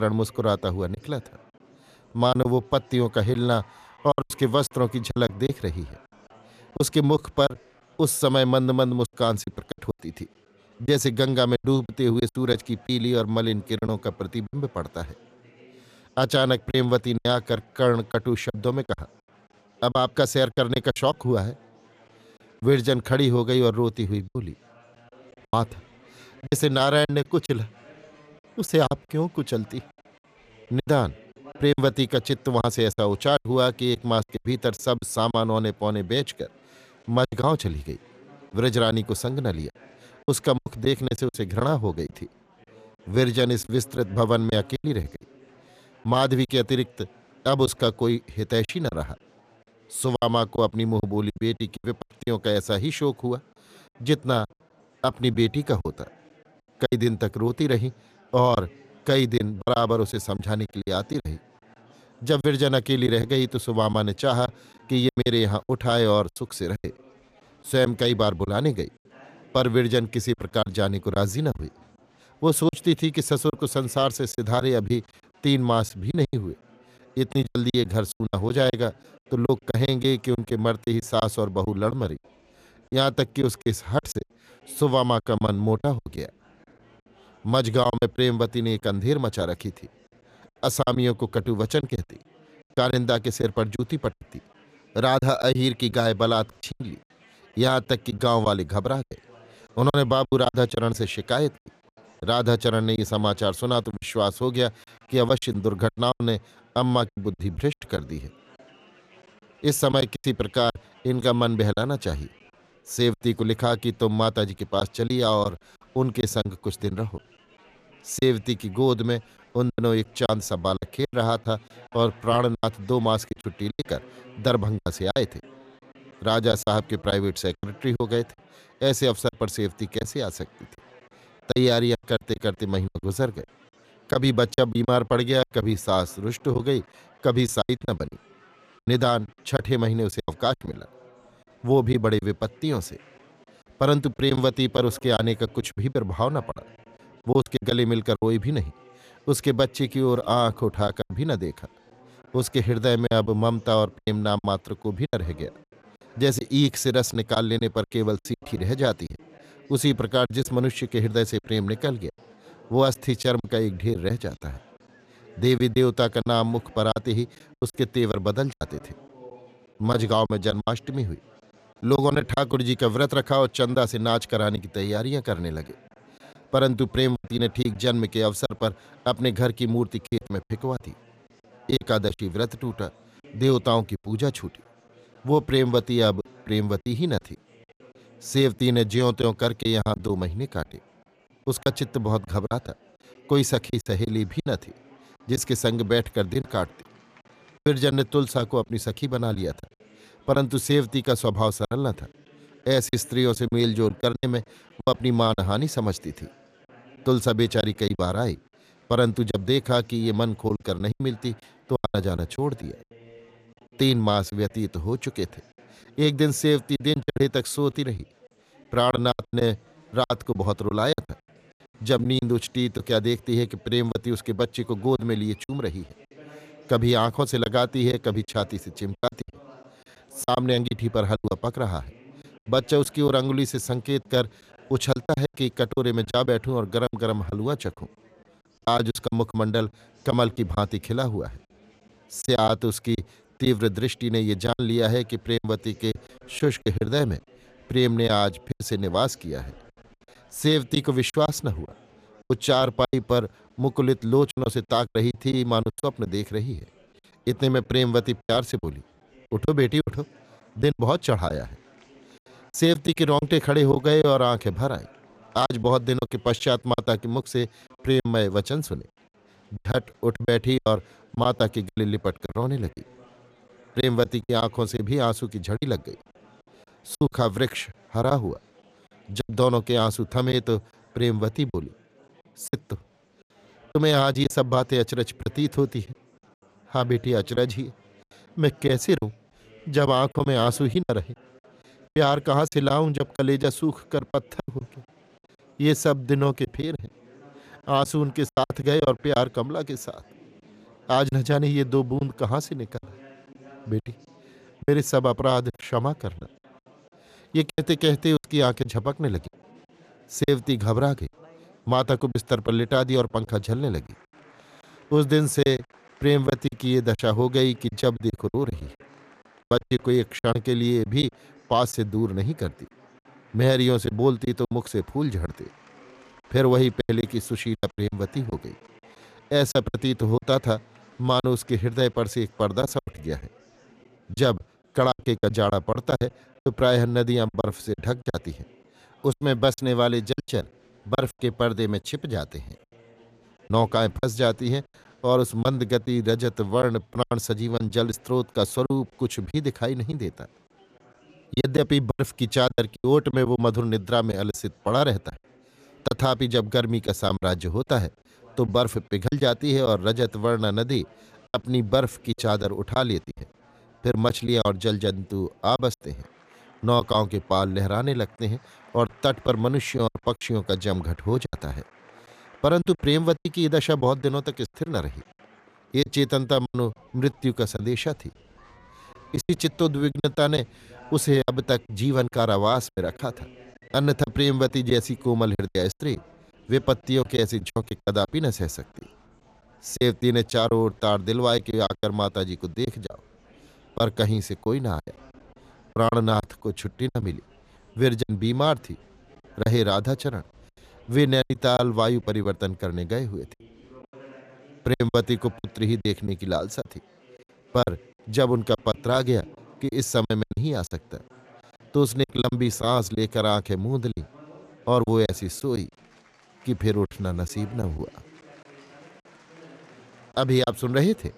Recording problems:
murmuring crowd; faint; throughout; 30 dB below the speech
choppy; very; 9% of the speech affected
abrupt cut into speech; at the start

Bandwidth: 14.5 kHz